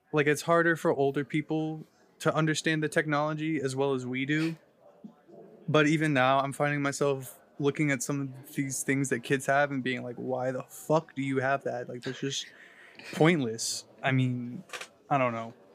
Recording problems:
murmuring crowd; faint; throughout; 30 dB below the speech

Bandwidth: 15 kHz